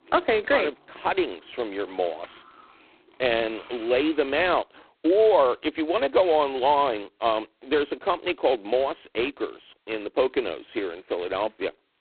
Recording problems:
phone-call audio; poor line; nothing above 4 kHz
traffic noise; faint; until 4.5 s; 25 dB below the speech

